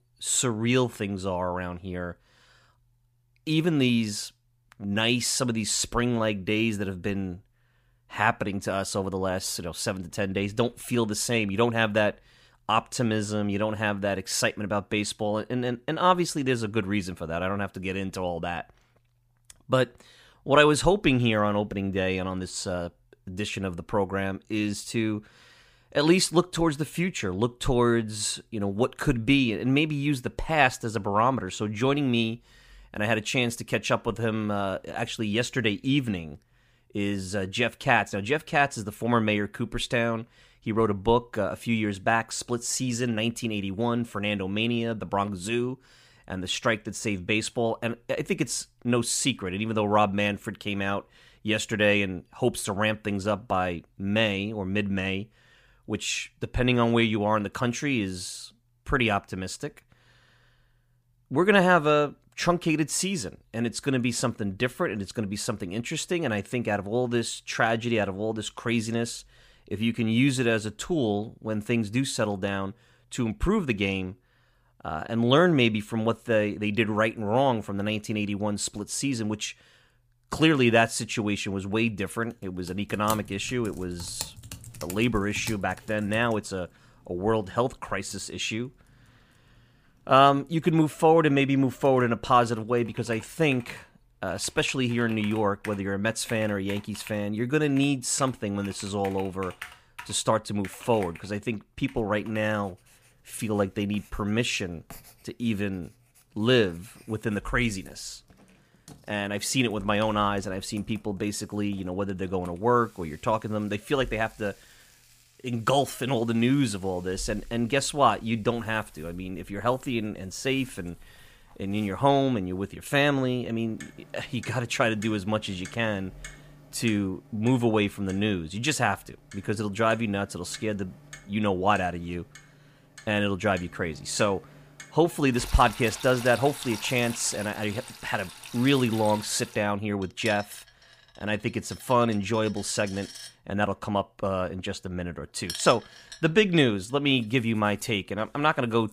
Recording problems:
household noises; noticeable; from 1:23 on; 20 dB below the speech

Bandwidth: 15 kHz